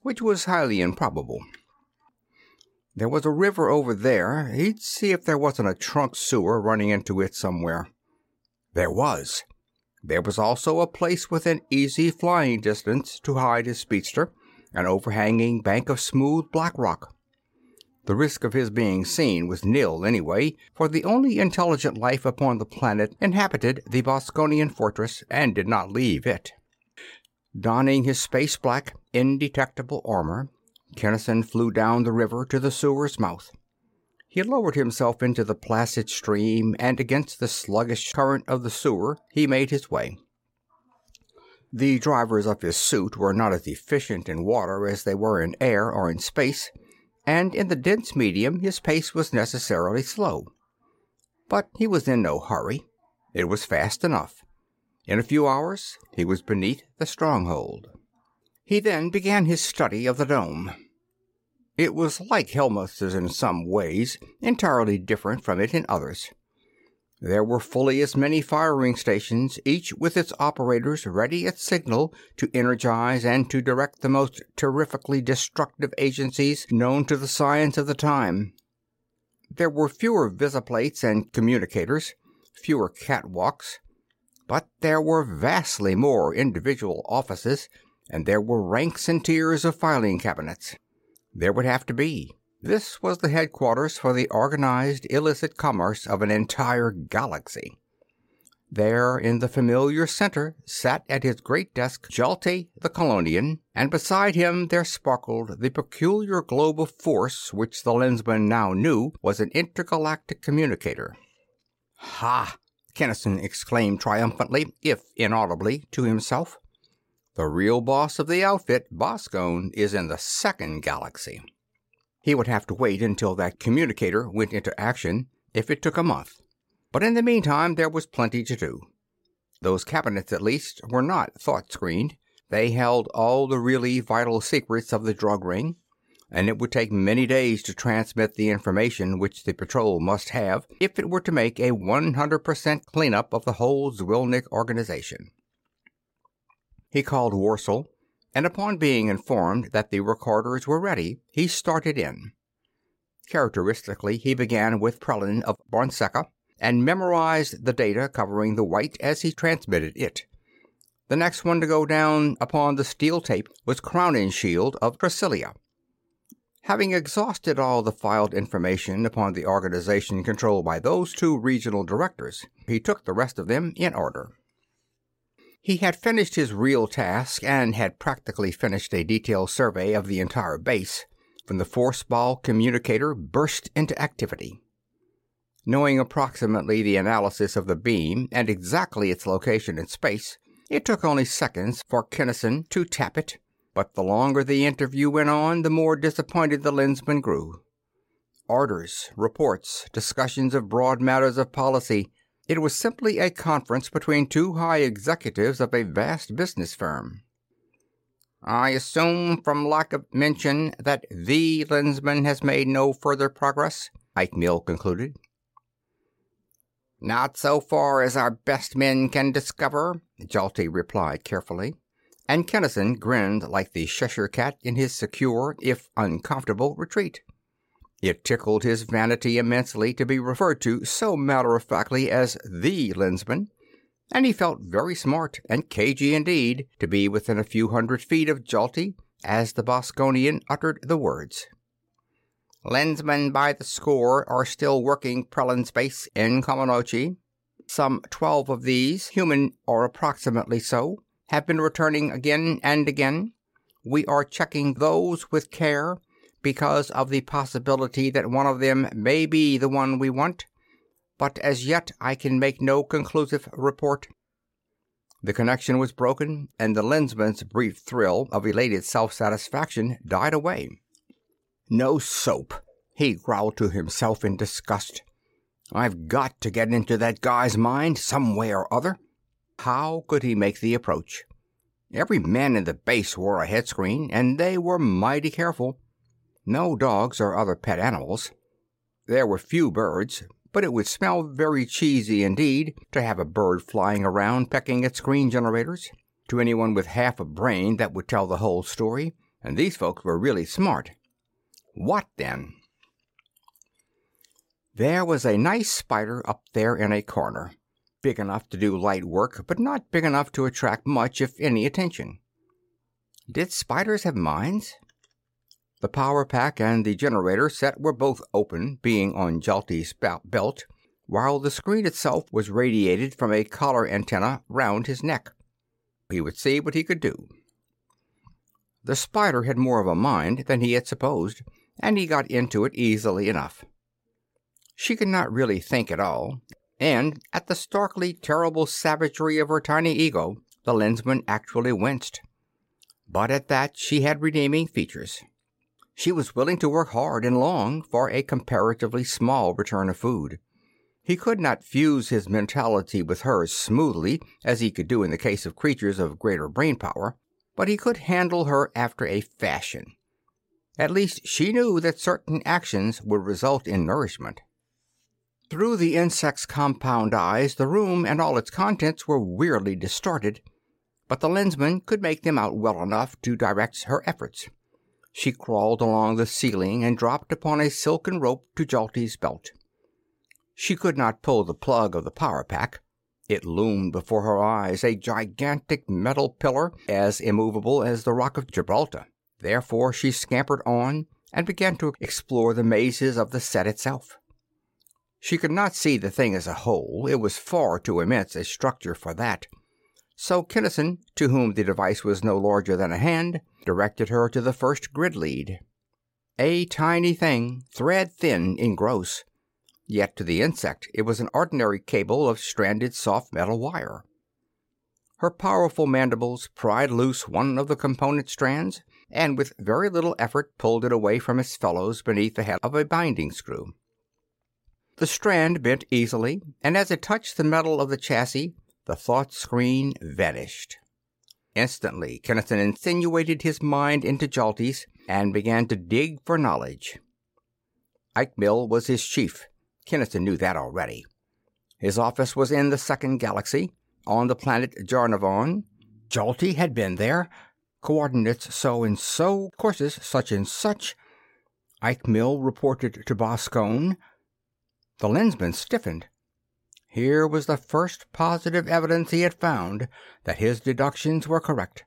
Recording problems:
none

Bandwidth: 16 kHz